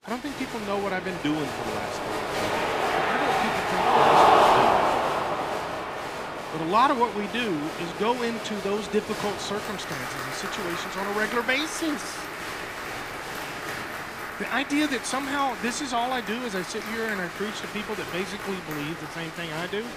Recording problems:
crowd noise; very loud; throughout; 1 dB above the speech

